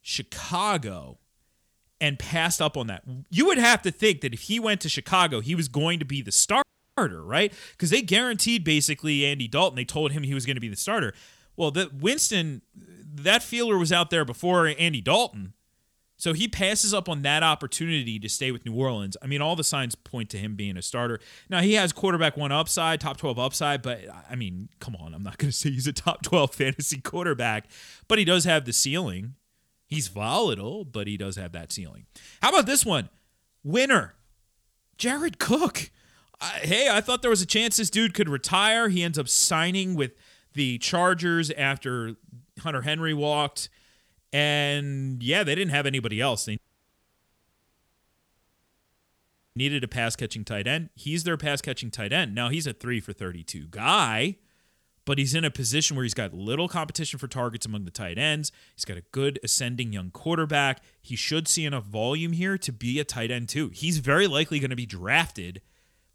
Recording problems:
audio cutting out; at 6.5 s and at 47 s for 3 s

